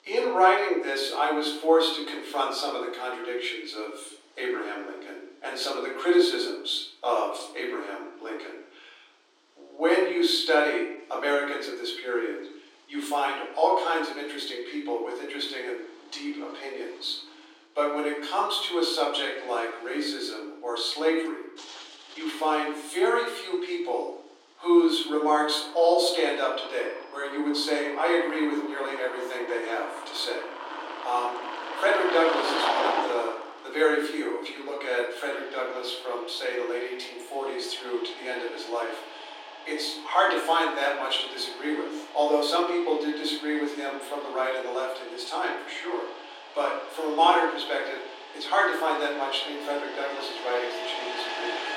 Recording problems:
off-mic speech; far
room echo; noticeable; dies away in 0.7 s
thin; somewhat; fading below 300 Hz
traffic noise; loud; throughout; 10 dB below the speech

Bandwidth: 16 kHz